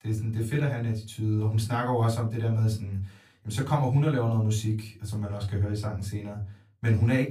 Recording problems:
off-mic speech; far
room echo; very slight; dies away in 0.2 s

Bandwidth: 15 kHz